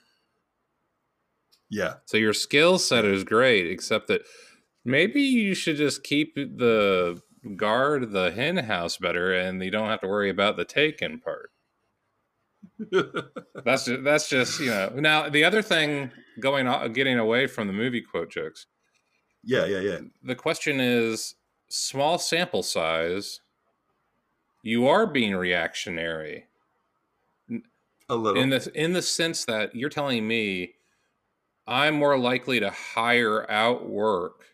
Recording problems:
uneven, jittery; strongly; from 2 to 32 s

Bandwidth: 15 kHz